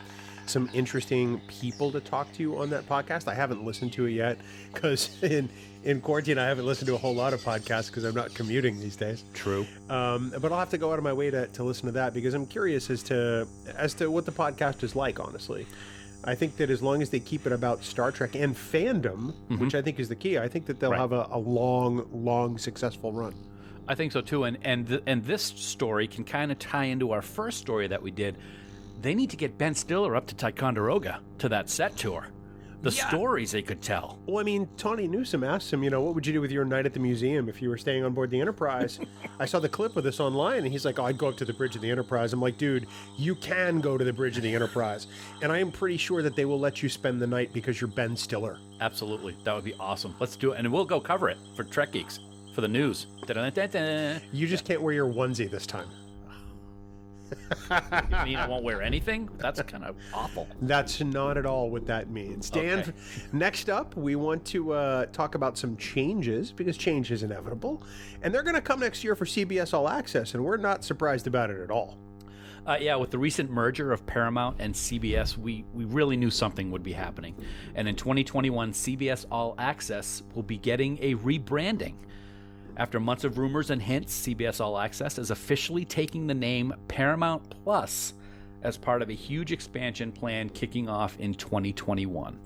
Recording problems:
animal sounds; noticeable; throughout; 20 dB below the speech
electrical hum; faint; throughout; 50 Hz, 25 dB below the speech

